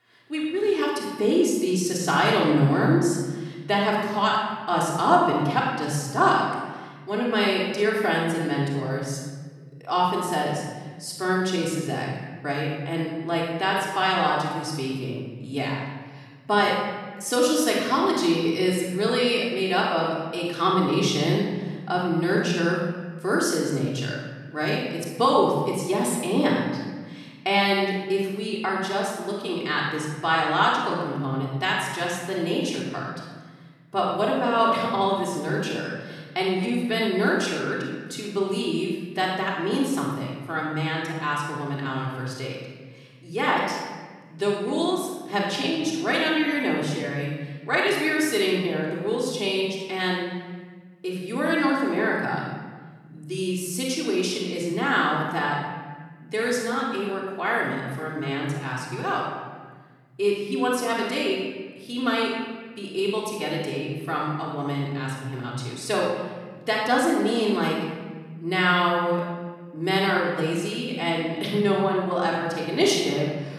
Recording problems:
off-mic speech; far
room echo; noticeable; dies away in 1.4 s

